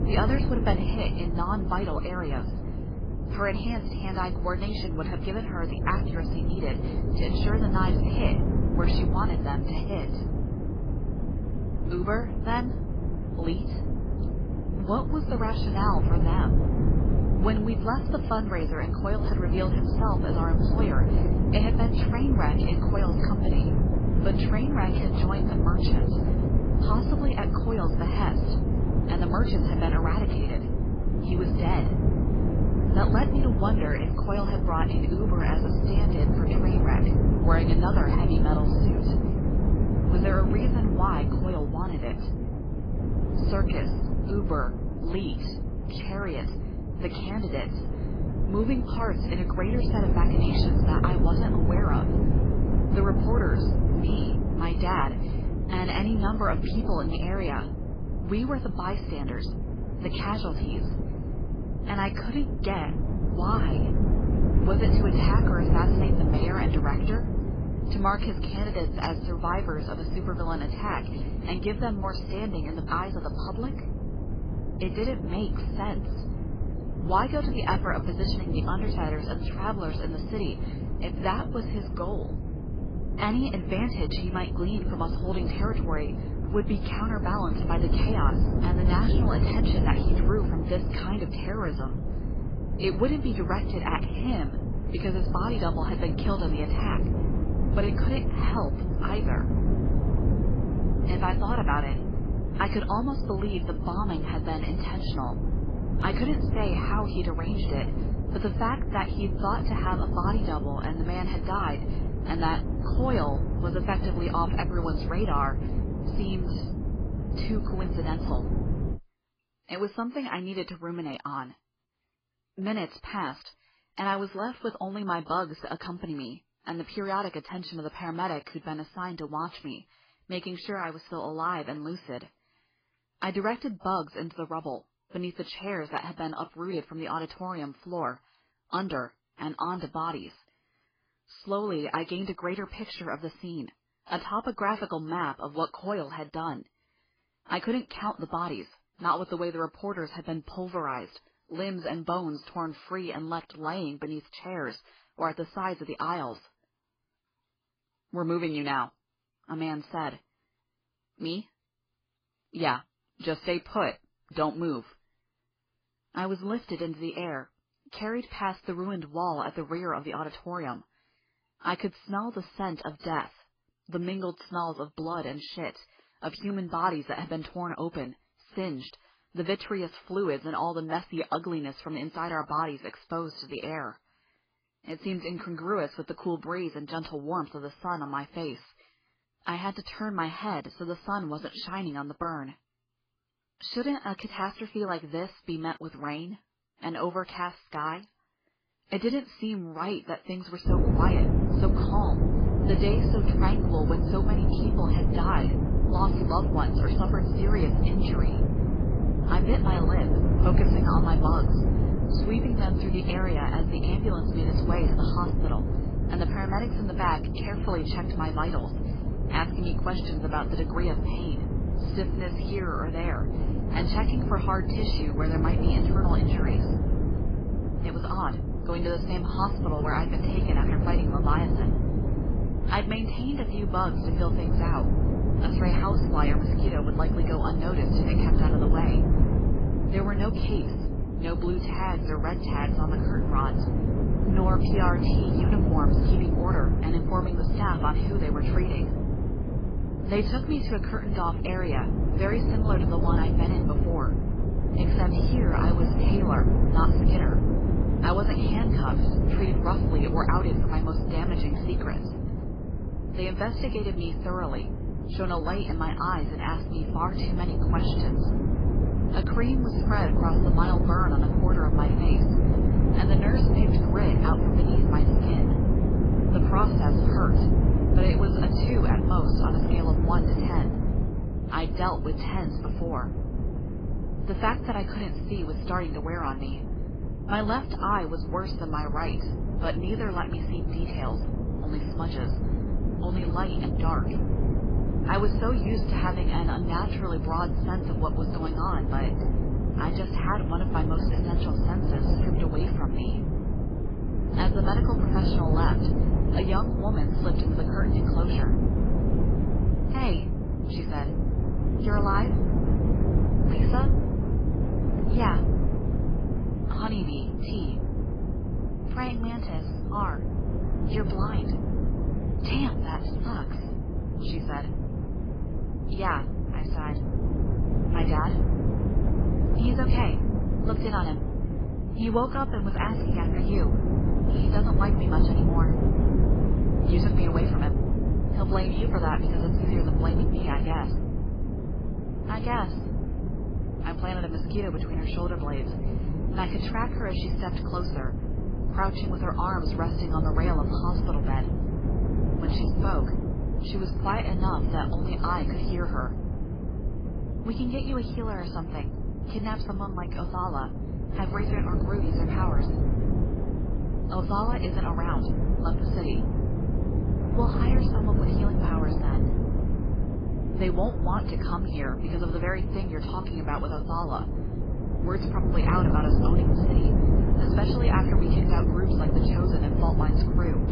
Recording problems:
garbled, watery; badly; nothing above 5 kHz
wind noise on the microphone; heavy; until 1:59 and from 3:21 on; 4 dB below the speech

